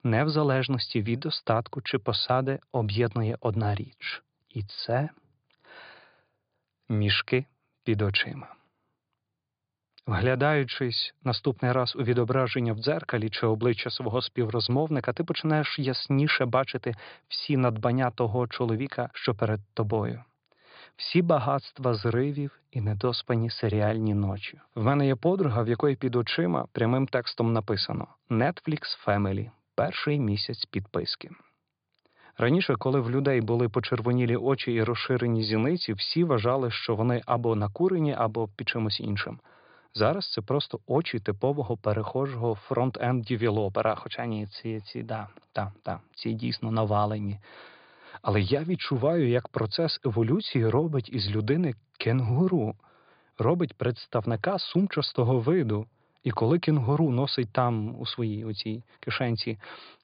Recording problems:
high frequencies cut off; severe; nothing above 5 kHz

